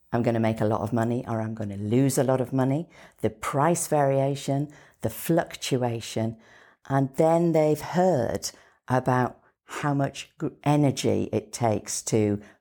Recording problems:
none

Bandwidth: 18.5 kHz